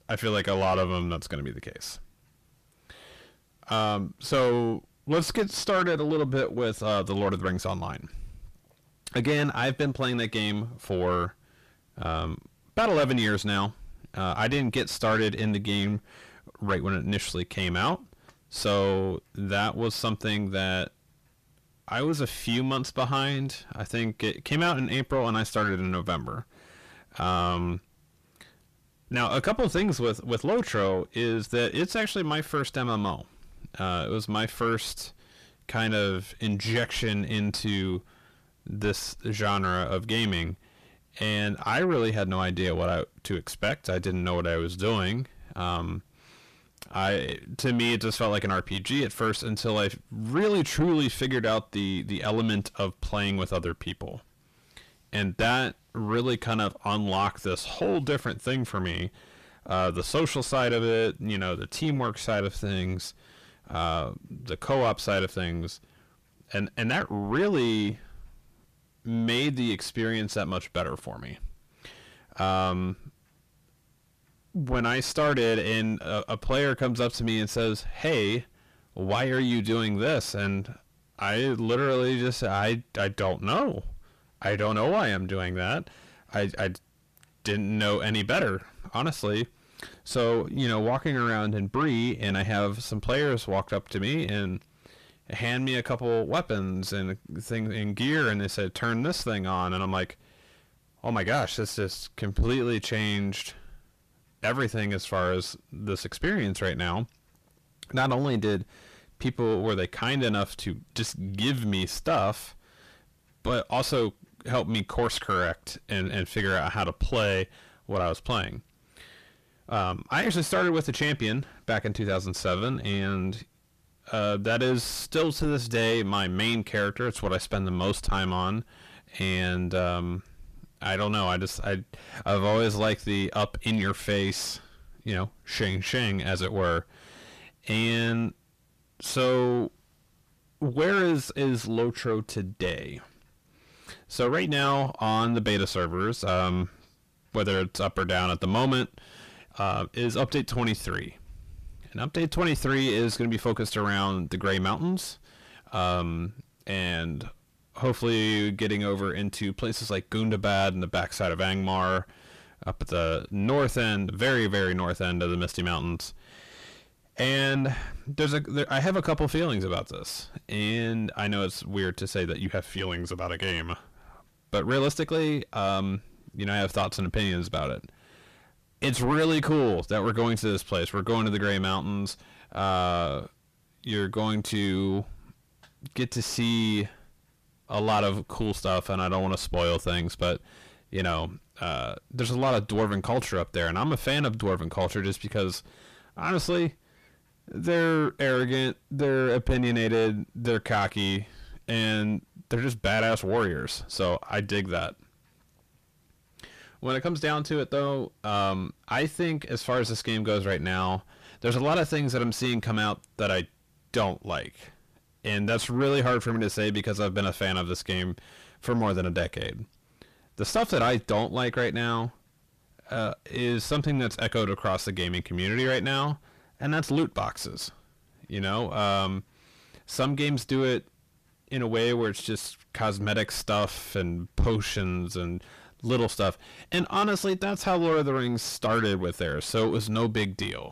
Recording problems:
distortion; heavy; 7 dB below the speech

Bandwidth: 14.5 kHz